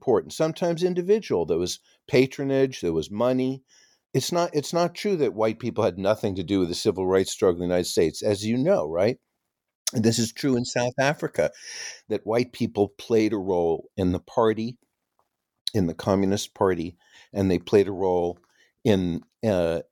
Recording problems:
none

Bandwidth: 18 kHz